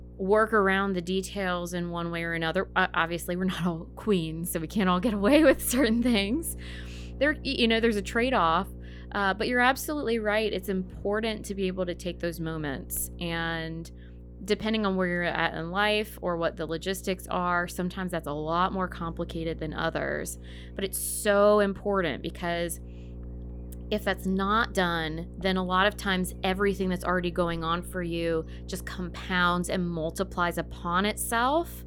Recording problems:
electrical hum; faint; throughout; 60 Hz, 25 dB below the speech

